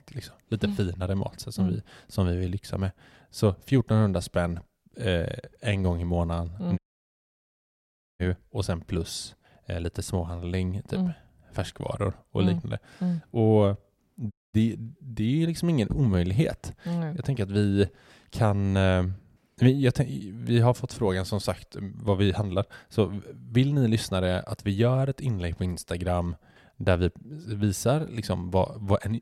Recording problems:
audio cutting out; at 7 s for 1.5 s and at 14 s

